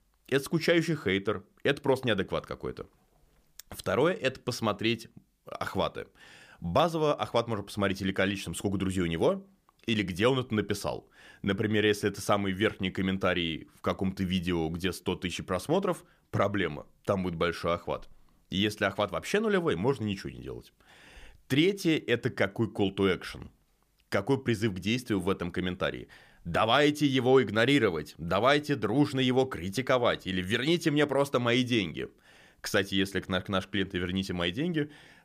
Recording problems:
none

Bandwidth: 15 kHz